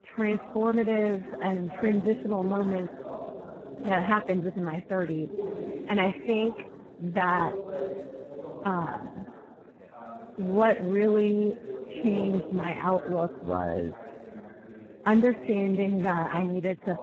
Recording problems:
garbled, watery; badly
background chatter; noticeable; throughout; 3 voices, 10 dB below the speech

